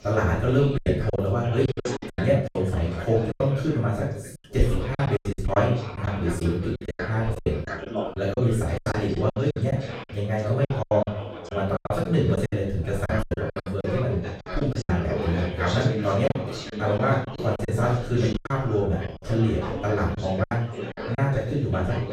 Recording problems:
off-mic speech; far
room echo; noticeable; dies away in 0.6 s
background chatter; loud; throughout; 3 voices, 9 dB below the speech
choppy; very; 12% of the speech affected

